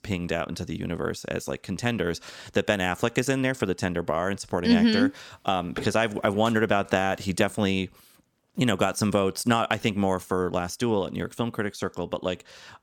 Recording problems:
none

